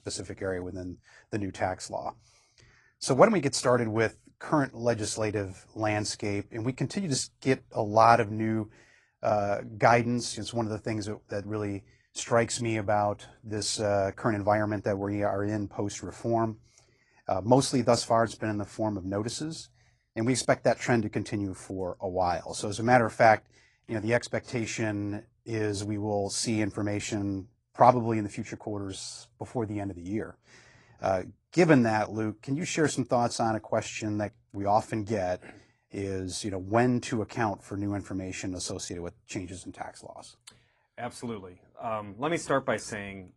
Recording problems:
garbled, watery; slightly

